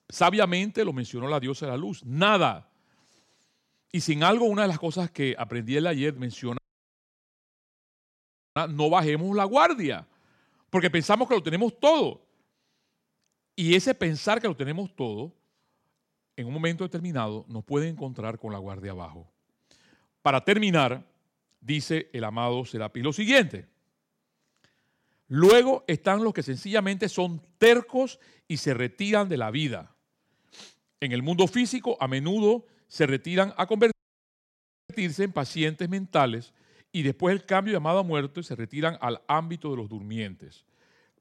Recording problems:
audio cutting out; at 6.5 s for 2 s and at 34 s for 1 s

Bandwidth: 16 kHz